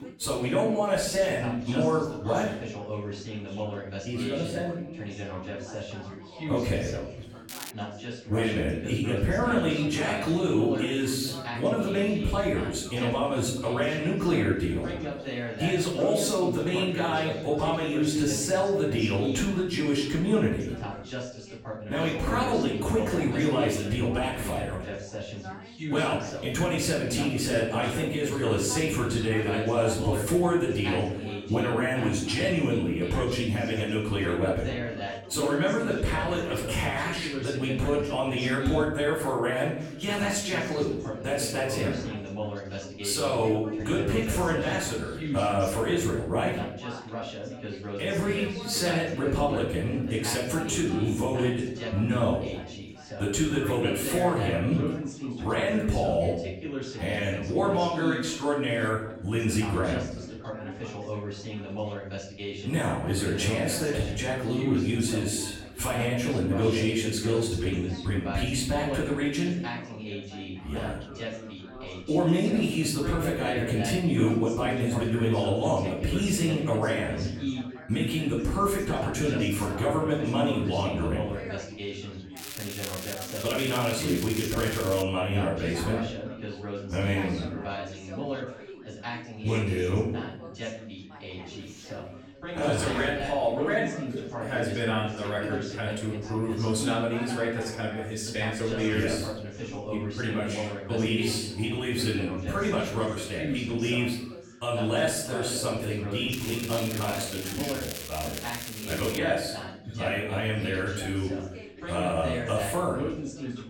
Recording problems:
off-mic speech; far
room echo; noticeable; dies away in 0.8 s
background chatter; loud; throughout; 3 voices, 9 dB below the speech
crackling; loud; at 7.5 s, from 1:22 to 1:25 and from 1:46 to 1:49; 9 dB below the speech

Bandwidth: 17.5 kHz